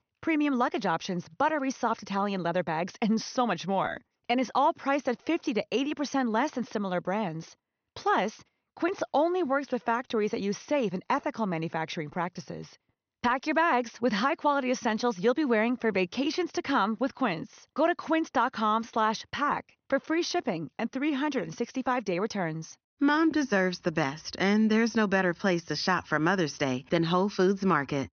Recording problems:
high frequencies cut off; noticeable; nothing above 6.5 kHz

